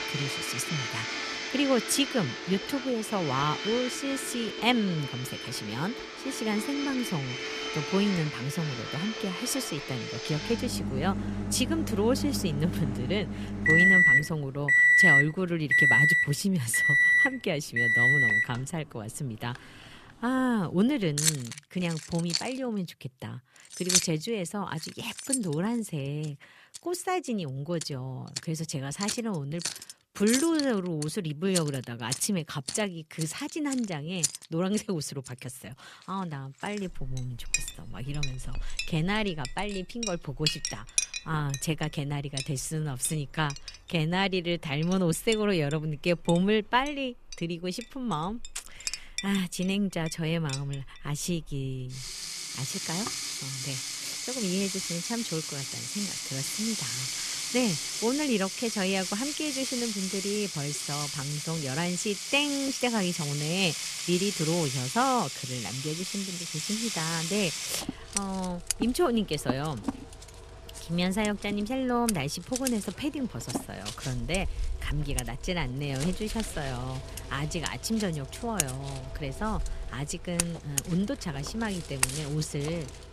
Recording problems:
household noises; very loud; throughout; 2 dB above the speech

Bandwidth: 14.5 kHz